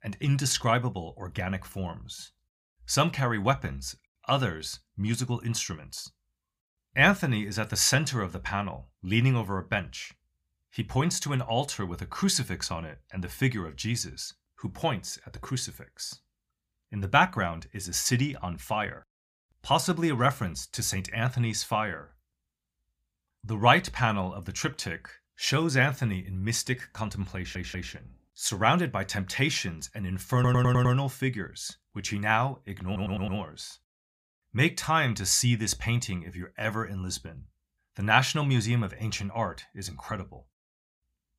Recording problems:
audio stuttering; at 27 s, at 30 s and at 33 s

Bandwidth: 15 kHz